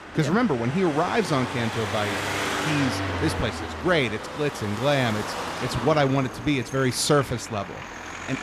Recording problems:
traffic noise; loud; throughout; 6 dB below the speech

